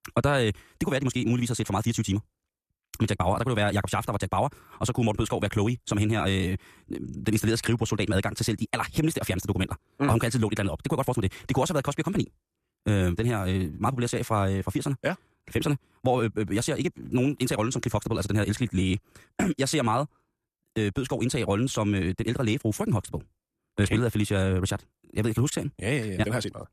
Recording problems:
wrong speed, natural pitch; too fast; 1.7 times normal speed

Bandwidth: 14.5 kHz